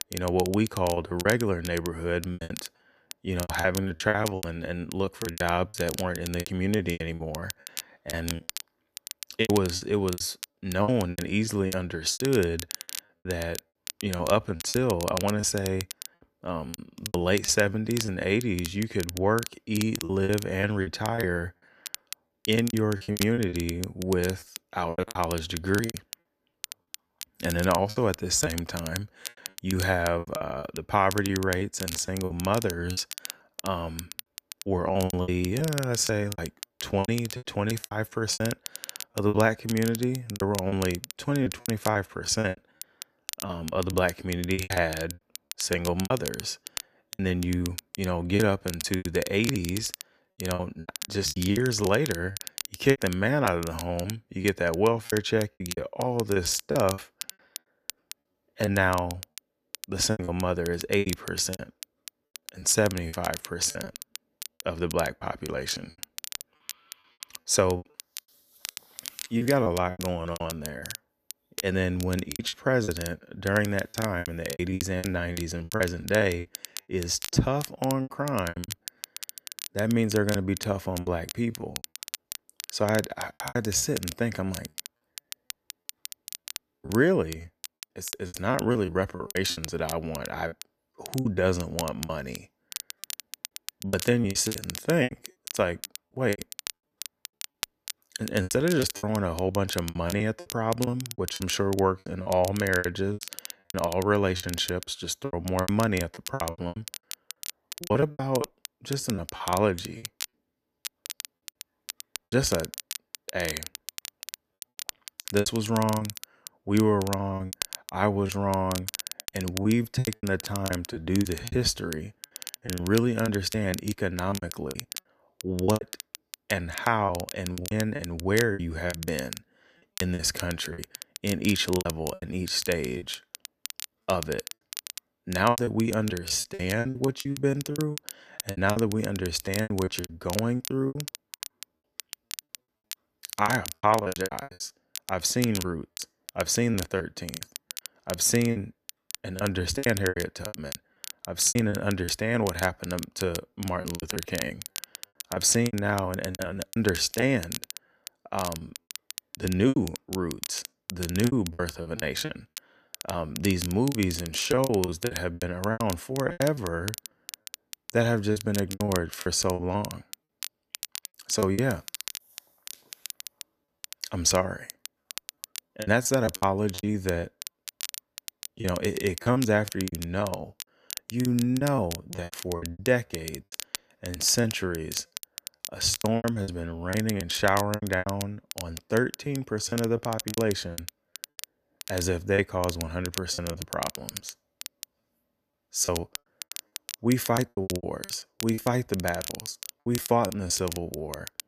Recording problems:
crackle, like an old record; noticeable; 10 dB below the speech
choppy; very; 15% of the speech affected

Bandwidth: 14.5 kHz